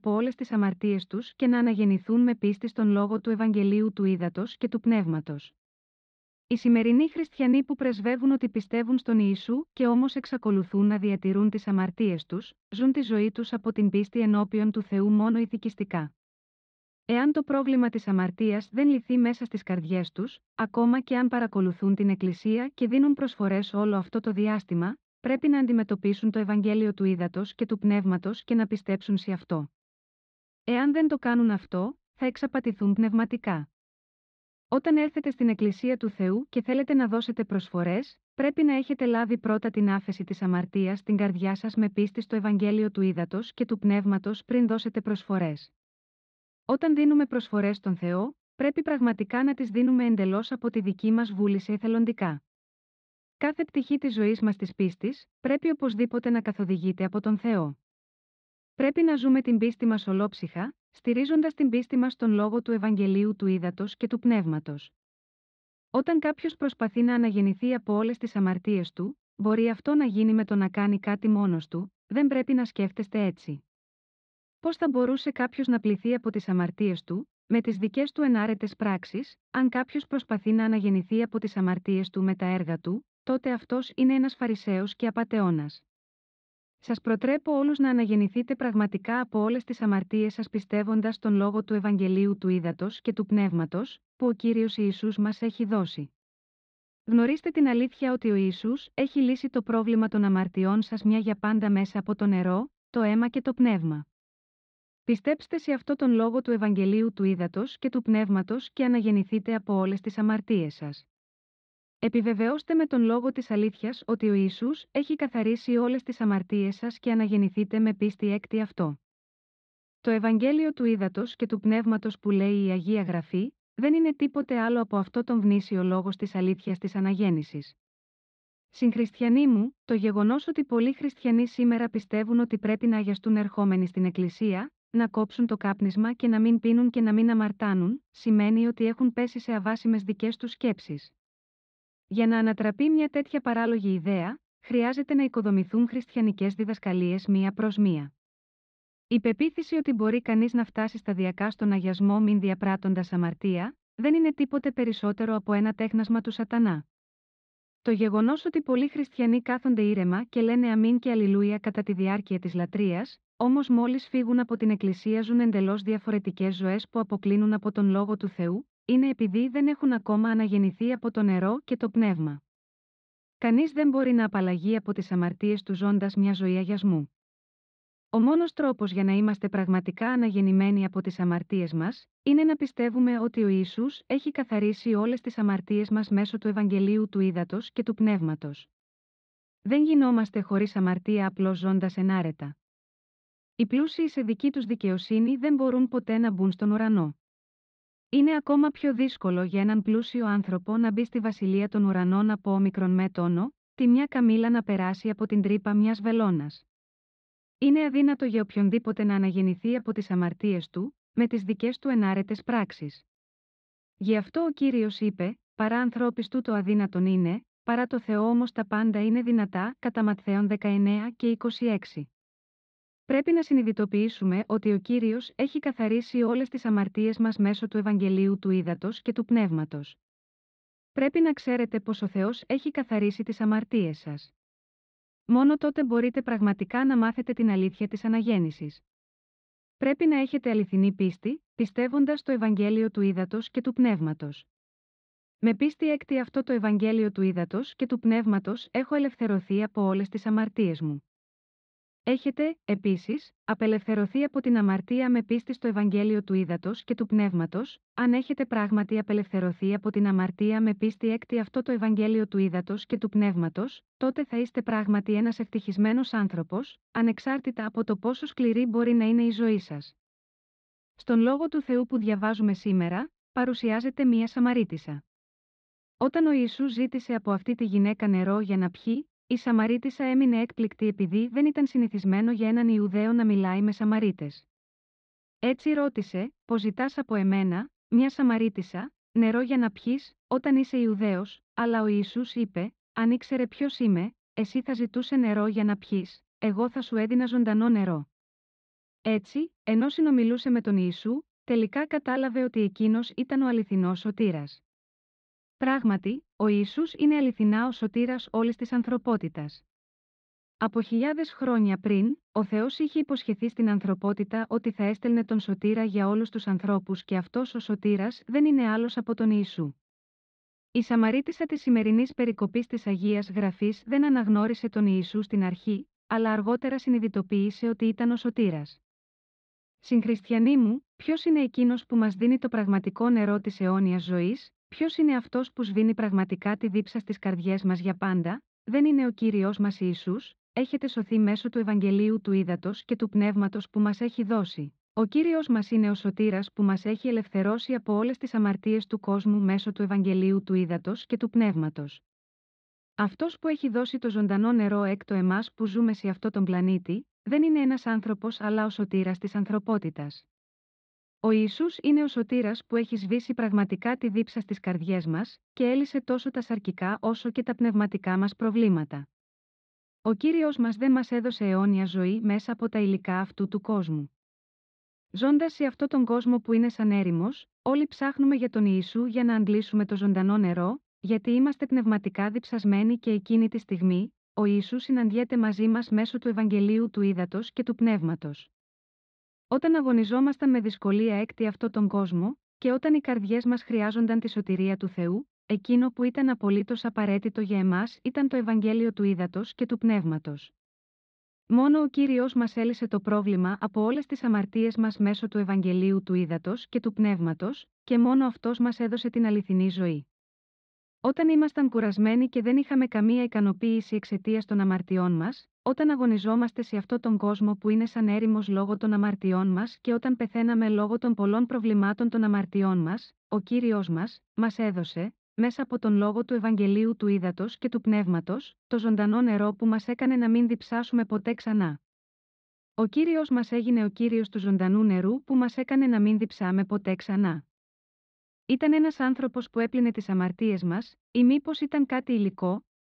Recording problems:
muffled; slightly; fading above 4 kHz

